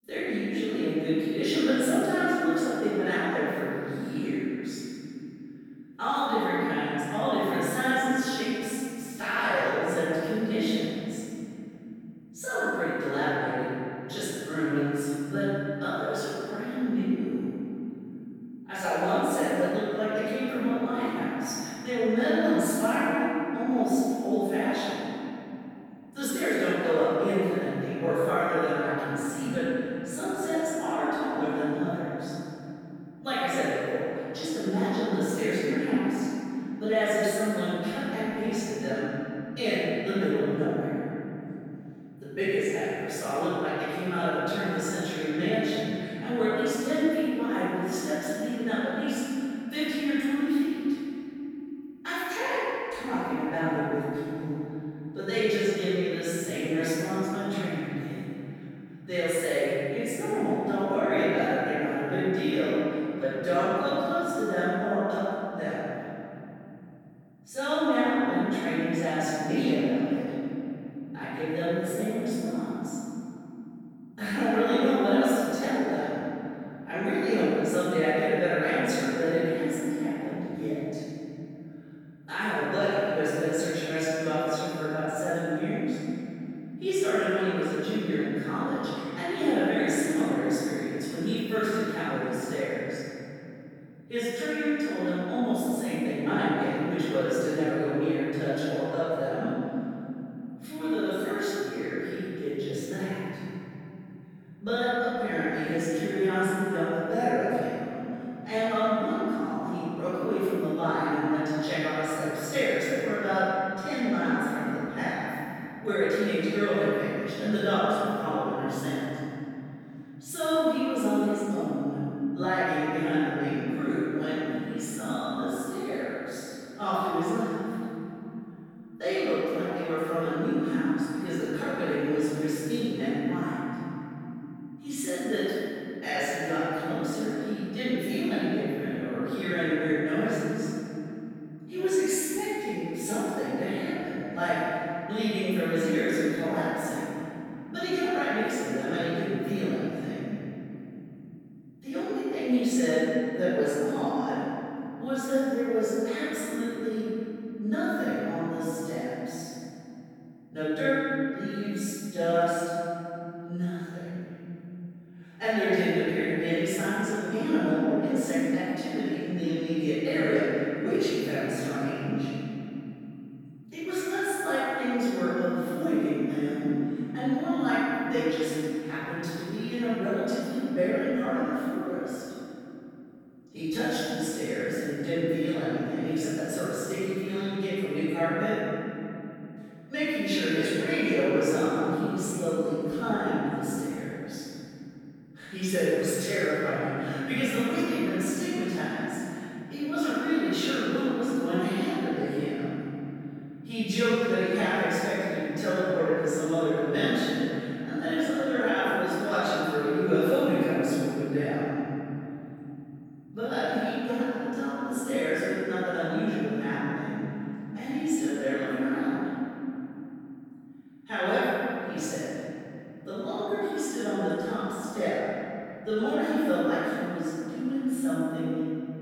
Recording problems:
room echo; strong; dies away in 3 s
off-mic speech; far

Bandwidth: 18.5 kHz